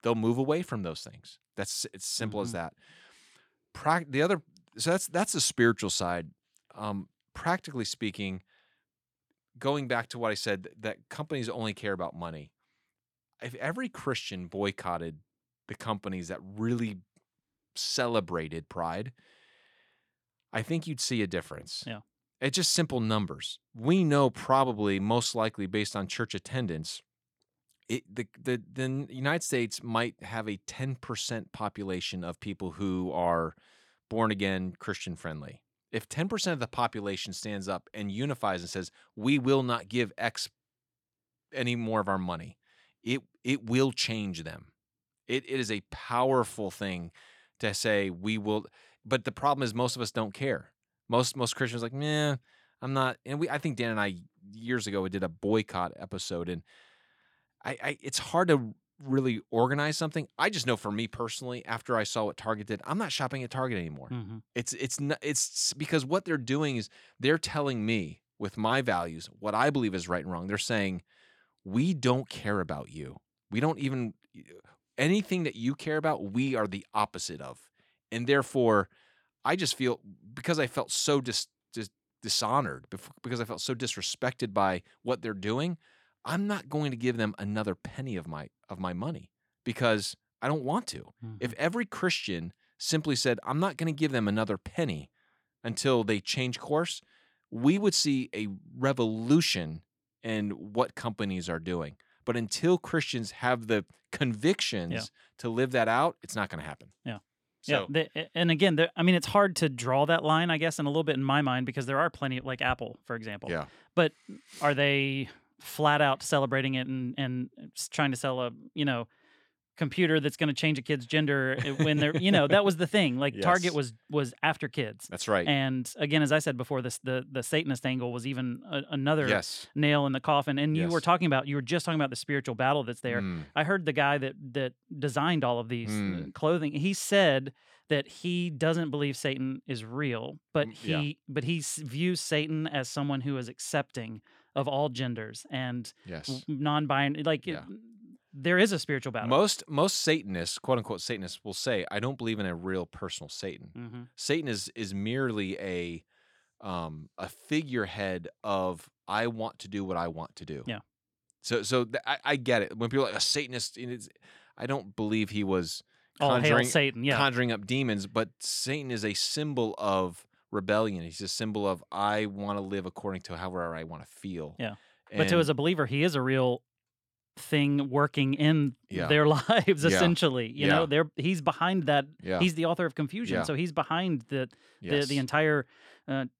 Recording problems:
none

